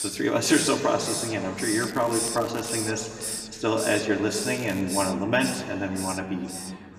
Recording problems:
room echo; slight; dies away in 2.3 s
off-mic speech; somewhat distant
hiss; loud; throughout; 6 dB below the speech
crackling; noticeable; at 2 s and at 4.5 s; 20 dB below the speech
background chatter; faint; throughout; 2 voices, 25 dB below the speech

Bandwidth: 14.5 kHz